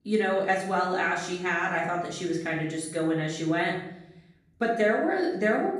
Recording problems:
off-mic speech; far
room echo; noticeable; dies away in 0.7 s

